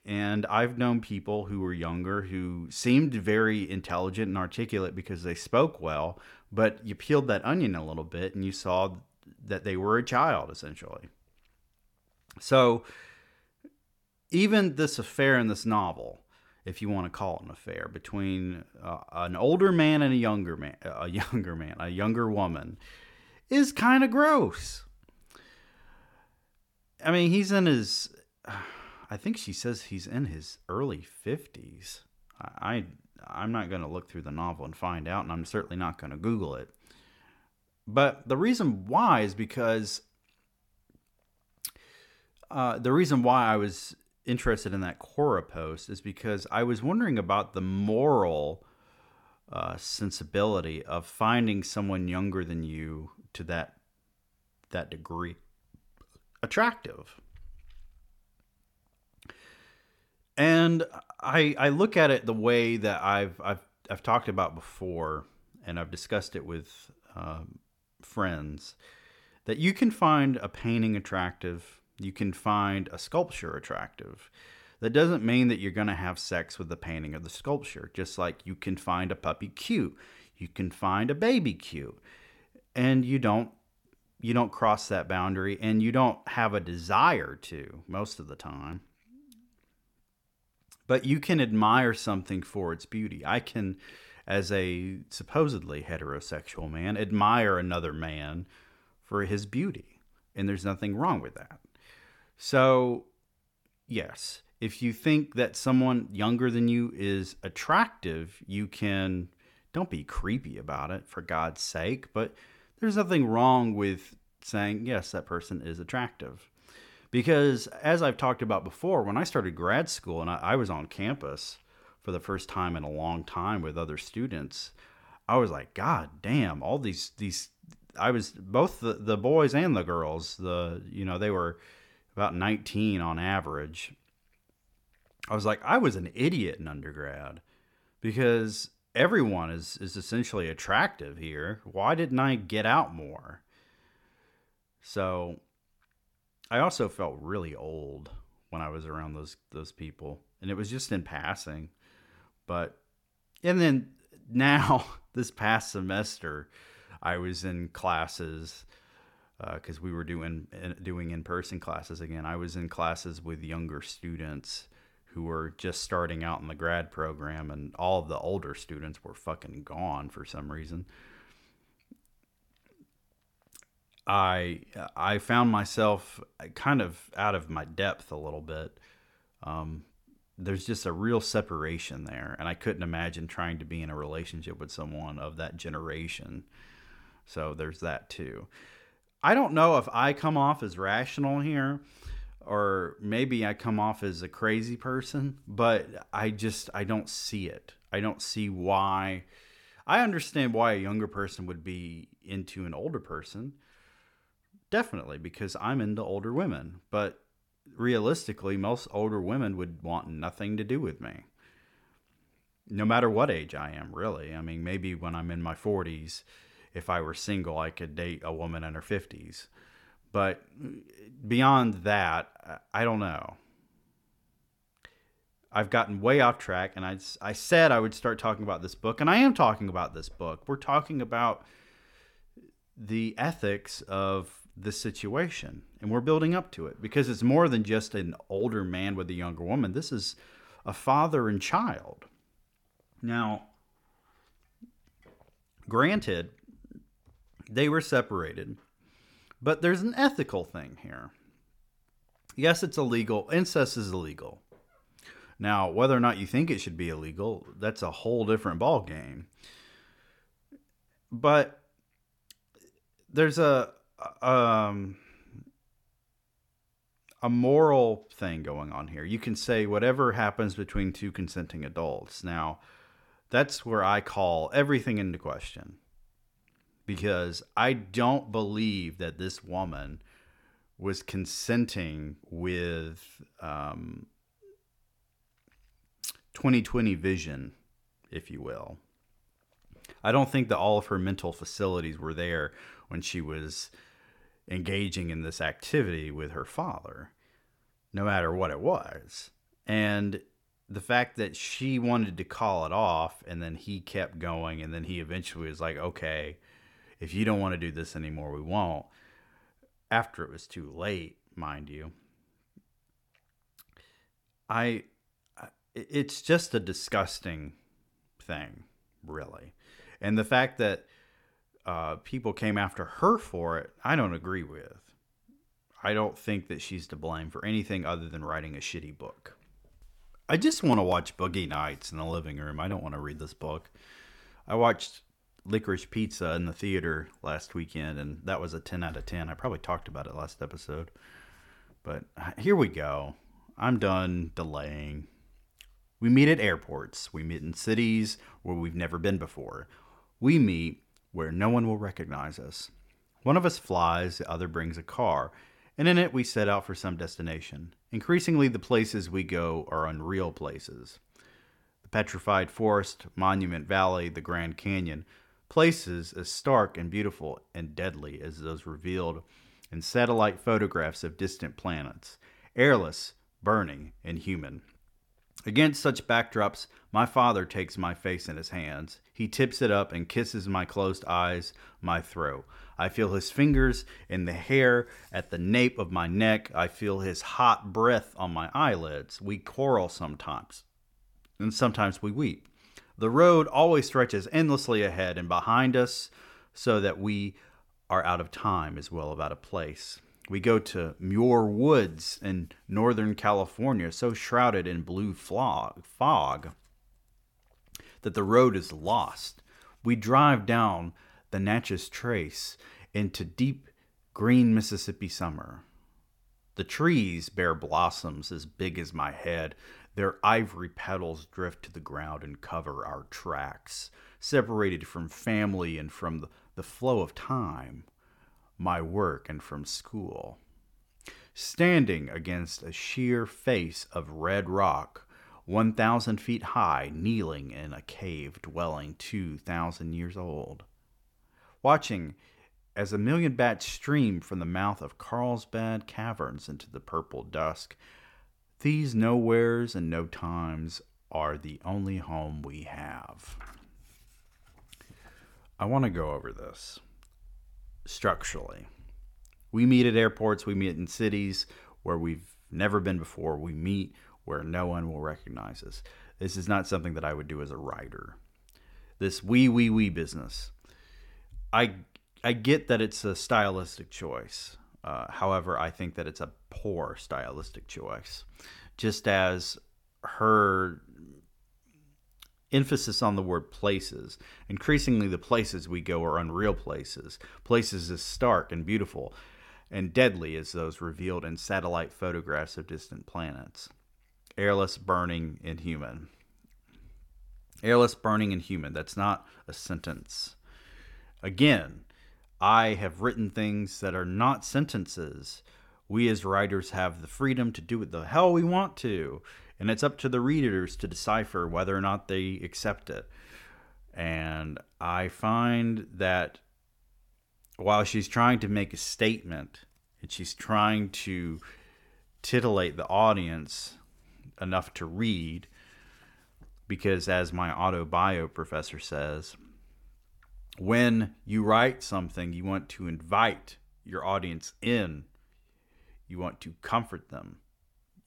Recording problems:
none

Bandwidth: 17.5 kHz